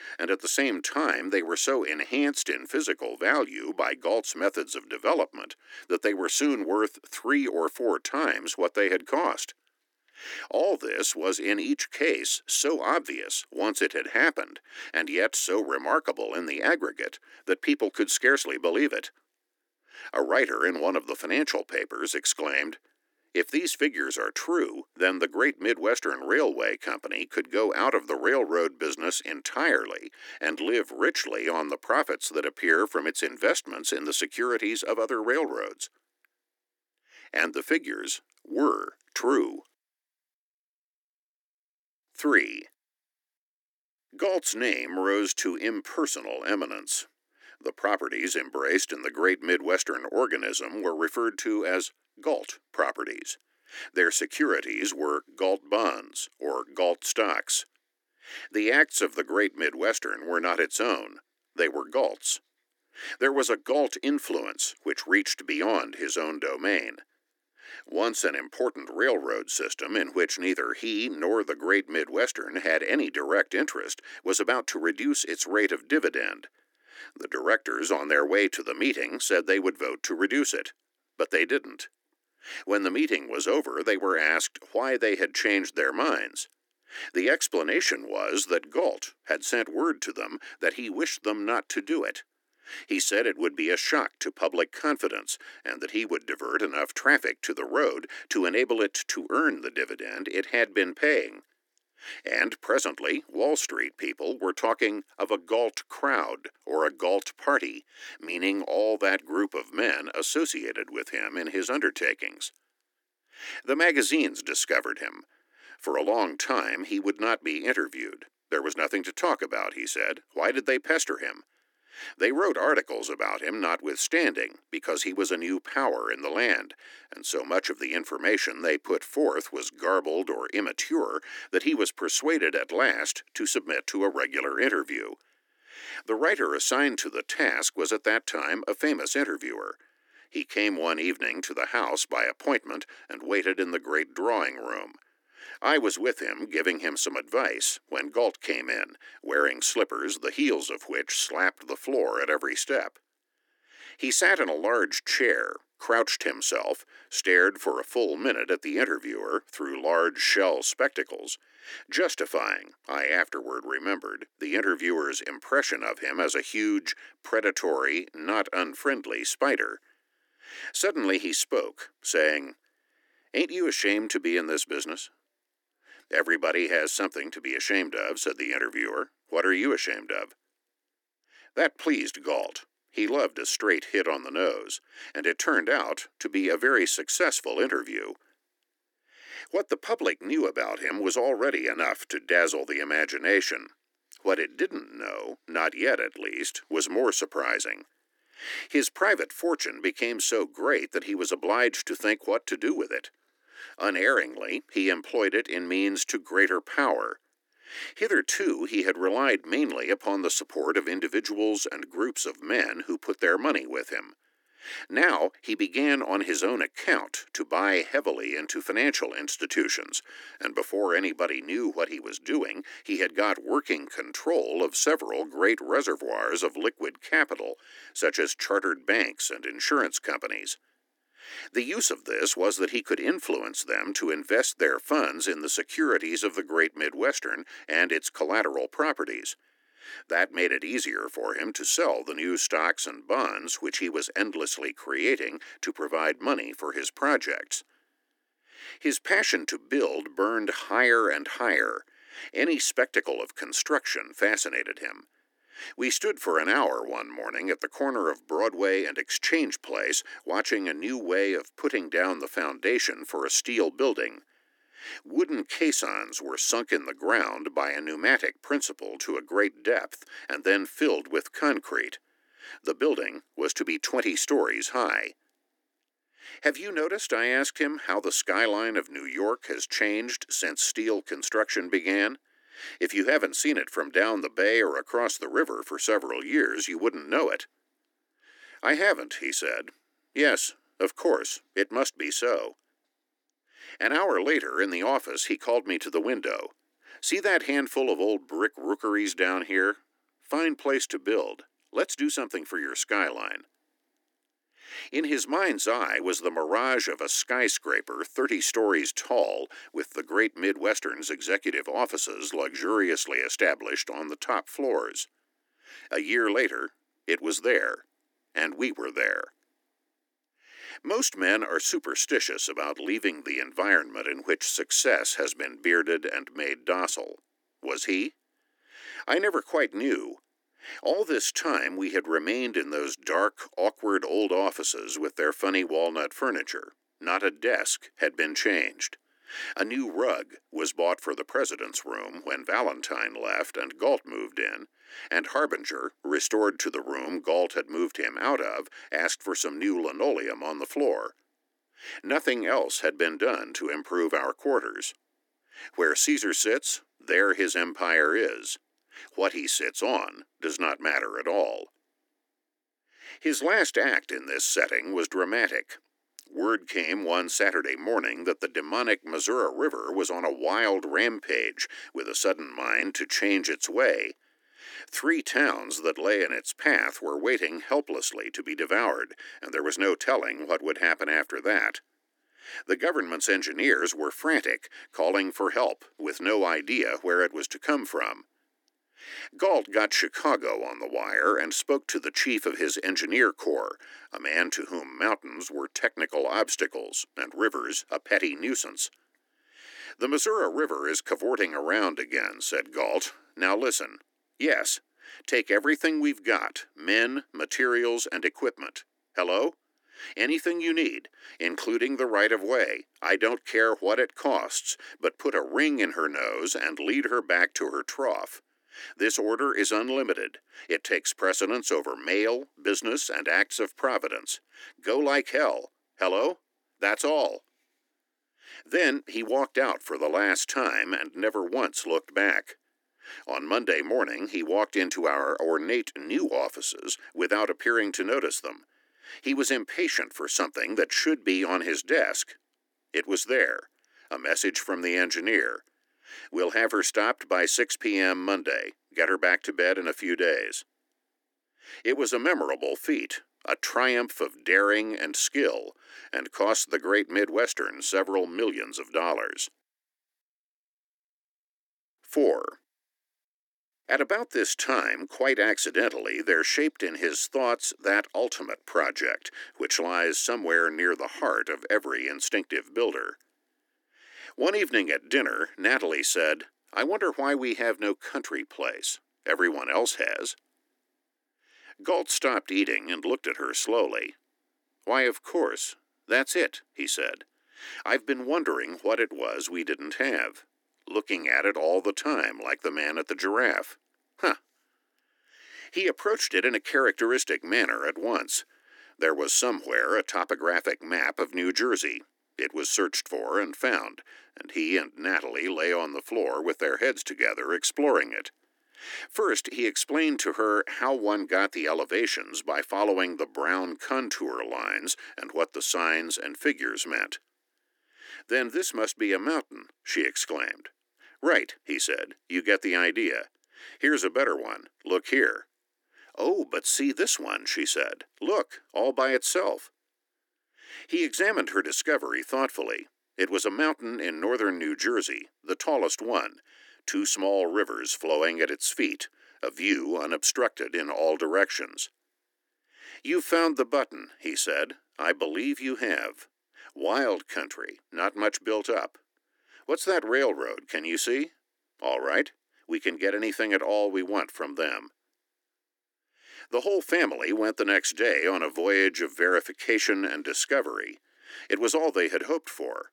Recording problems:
thin; somewhat; fading below 300 Hz

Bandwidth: 18.5 kHz